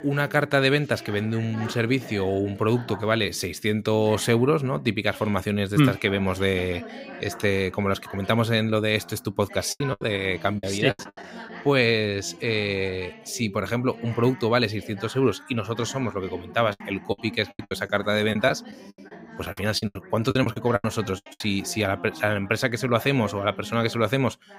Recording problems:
background chatter; noticeable; throughout; 2 voices, 15 dB below the speech
choppy; very; from 9.5 to 11 s and from 17 to 21 s; 21% of the speech affected

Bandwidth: 15.5 kHz